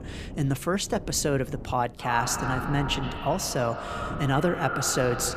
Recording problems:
echo of what is said; strong; from 2 s on; 120 ms later, 7 dB below the speech
wind noise on the microphone; occasional gusts; 20 dB below the speech

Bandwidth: 14.5 kHz